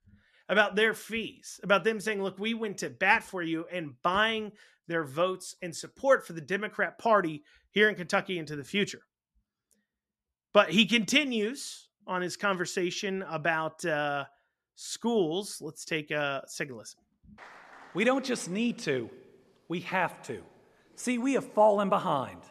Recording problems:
none

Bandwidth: 13.5 kHz